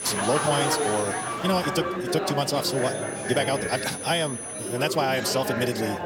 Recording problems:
wrong speed, natural pitch; too fast; 1.5 times normal speed
high-pitched whine; loud; until 1.5 s and from 2.5 to 5 s; 10 kHz, 7 dB below the speech
murmuring crowd; loud; throughout; 3 dB below the speech
alarm; noticeable; at 1 s; peak 7 dB below the speech

